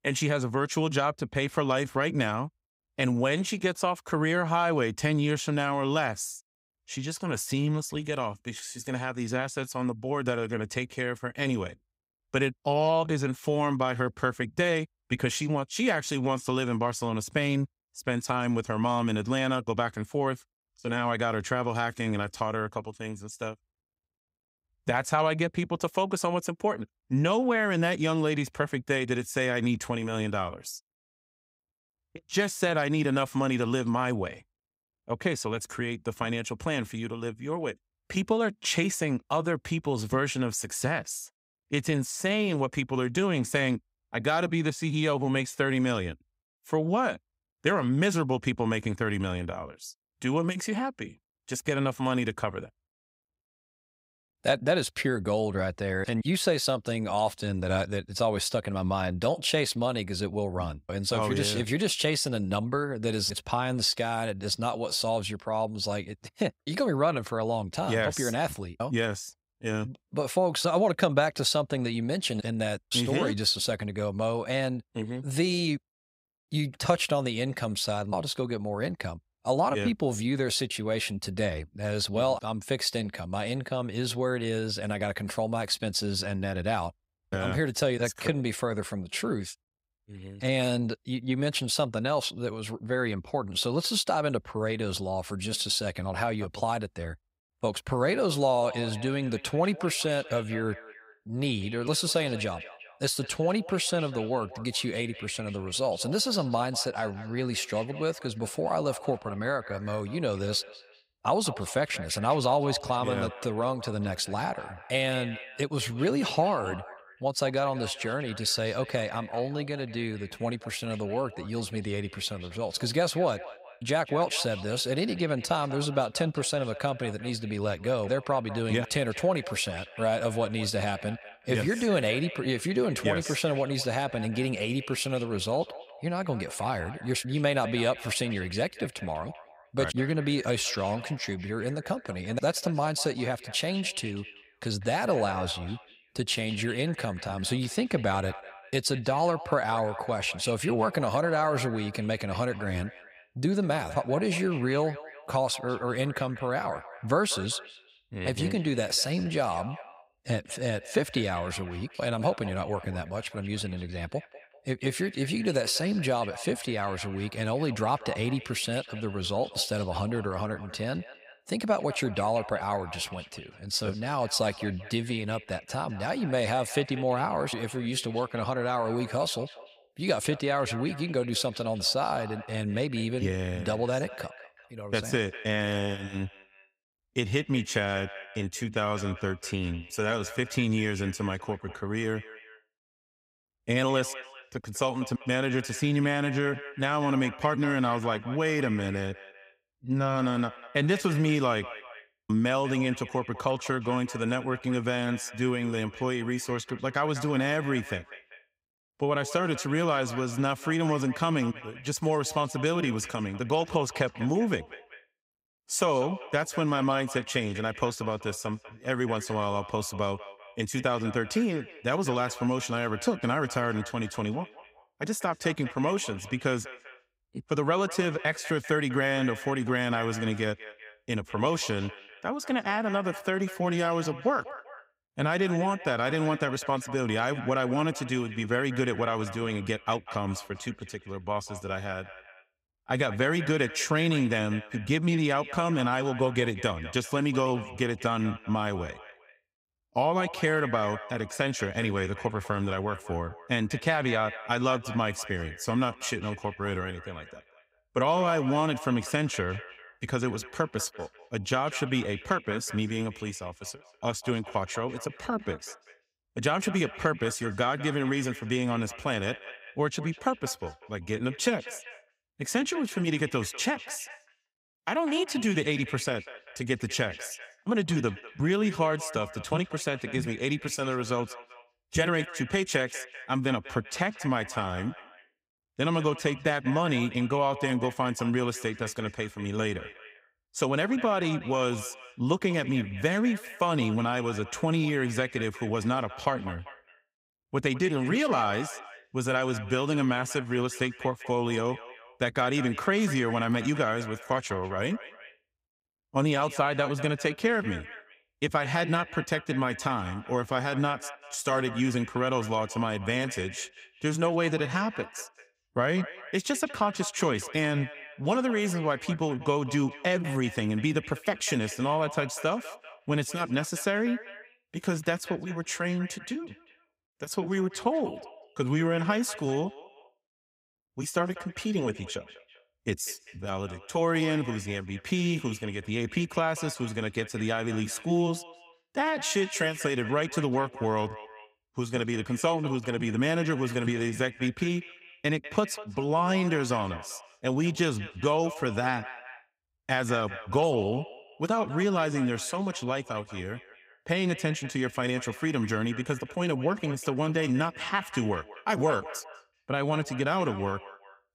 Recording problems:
echo of what is said; noticeable; from 1:39 on; 200 ms later, 15 dB below the speech

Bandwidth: 15.5 kHz